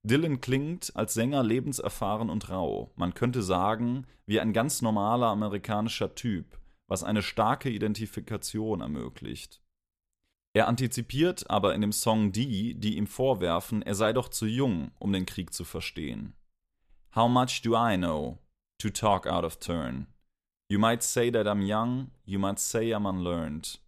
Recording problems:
none

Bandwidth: 14.5 kHz